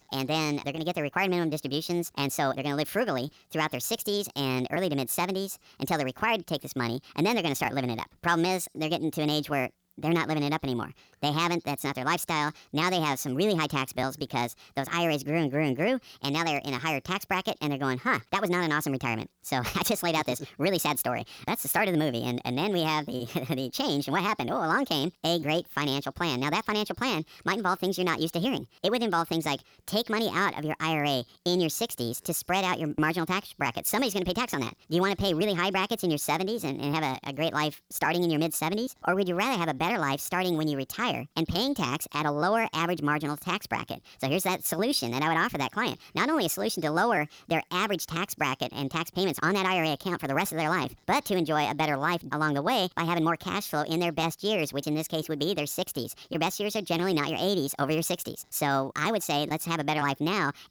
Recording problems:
wrong speed and pitch; too fast and too high; 1.5 times normal speed

